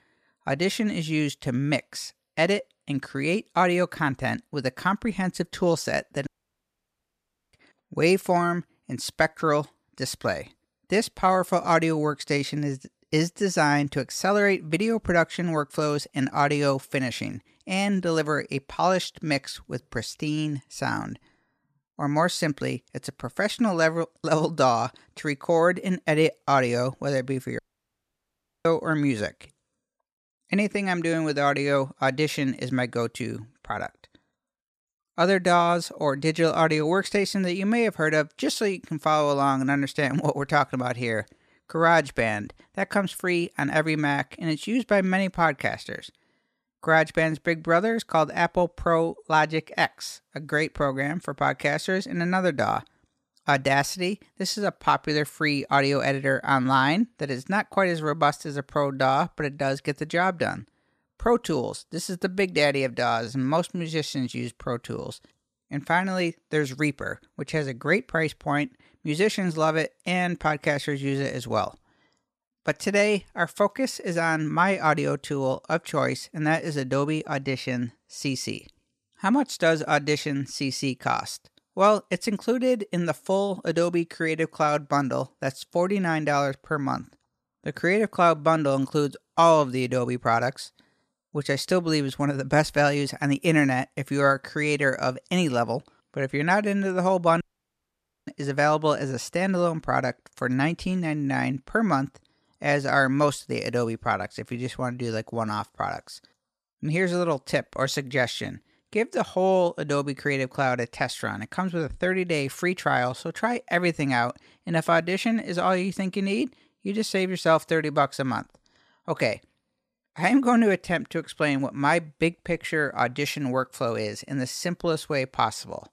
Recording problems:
audio cutting out; at 6.5 s for 1.5 s, at 28 s for 1 s and at 1:37 for 1 s

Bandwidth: 14.5 kHz